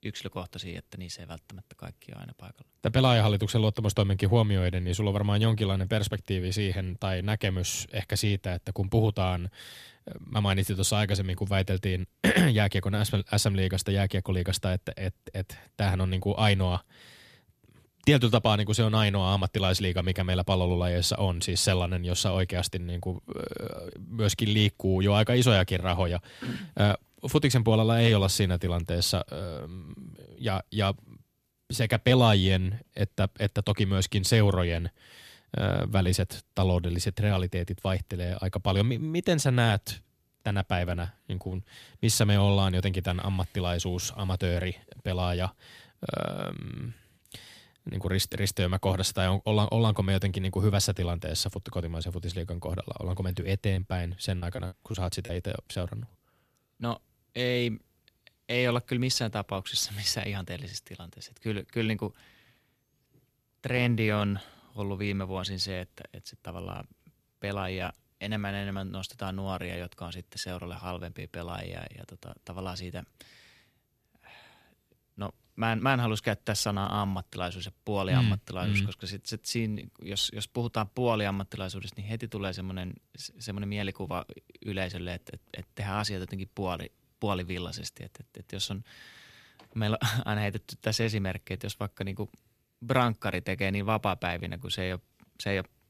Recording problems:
choppy; very; from 54 to 56 s; 10% of the speech affected

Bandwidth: 15 kHz